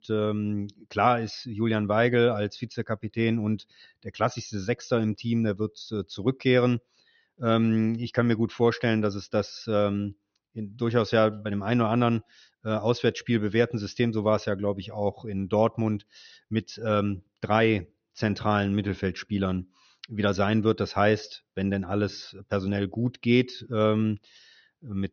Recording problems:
high frequencies cut off; noticeable; nothing above 6.5 kHz

